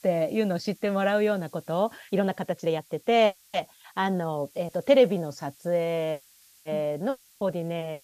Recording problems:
hiss; faint; throughout; 25 dB below the speech

